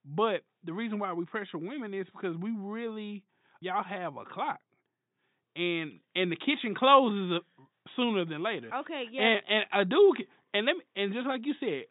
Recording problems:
high frequencies cut off; severe; nothing above 4 kHz

